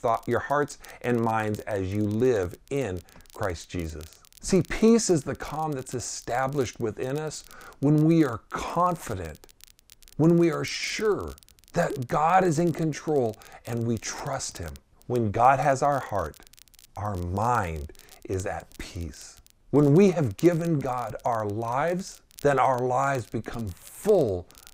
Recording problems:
crackle, like an old record; faint; 25 dB below the speech

